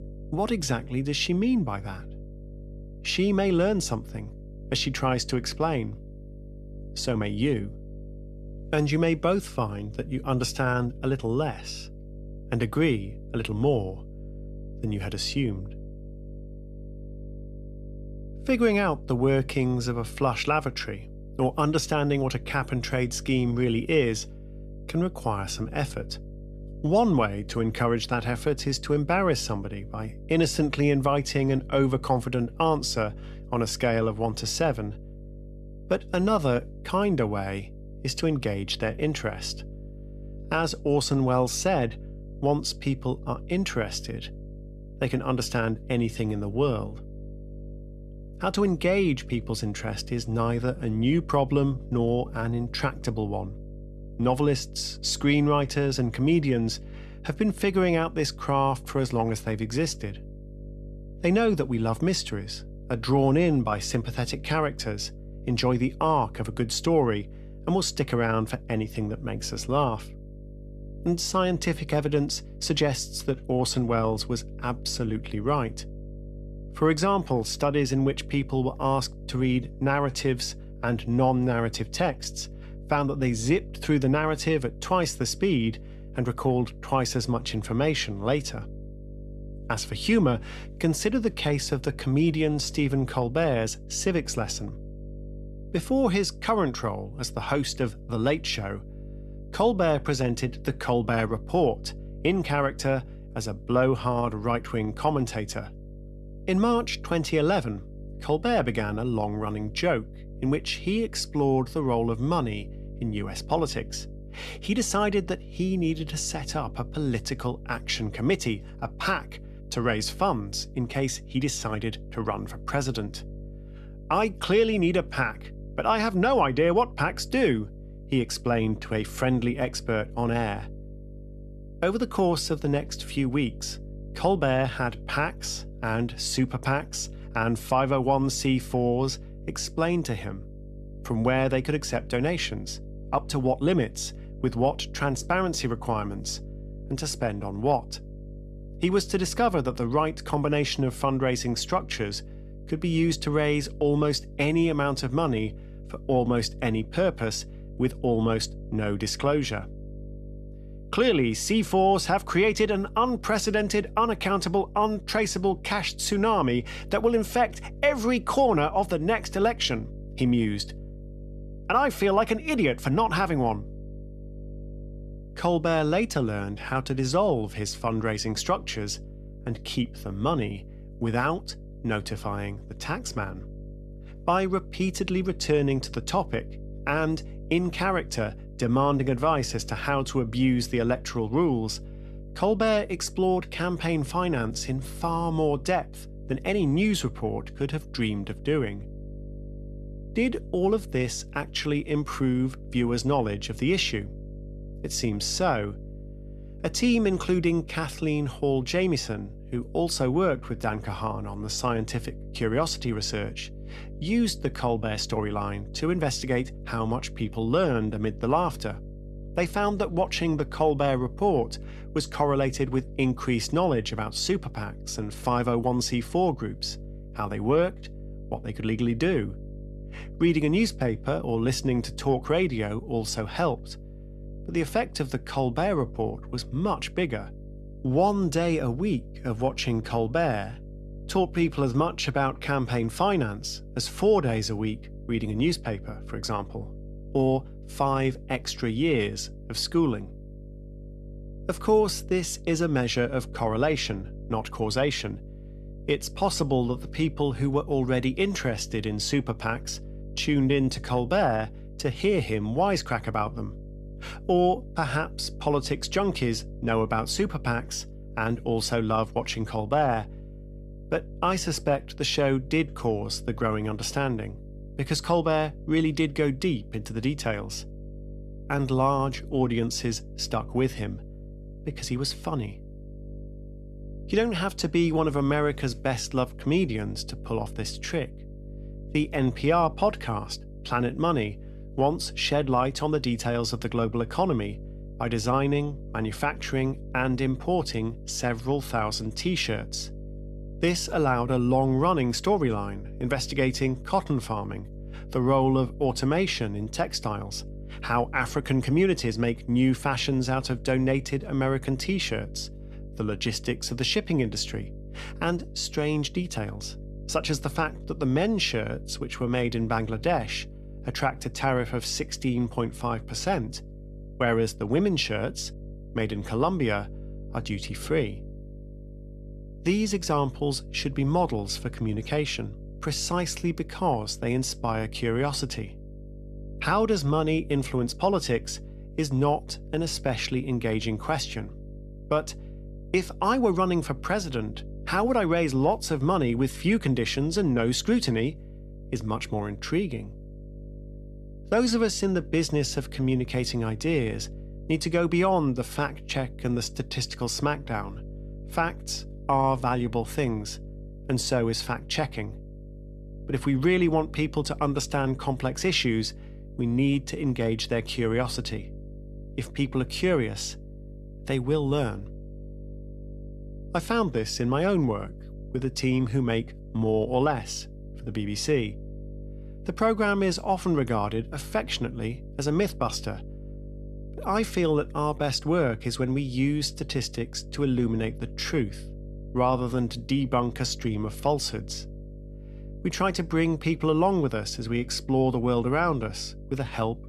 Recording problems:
electrical hum; faint; throughout; 50 Hz, 25 dB below the speech

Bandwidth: 13.5 kHz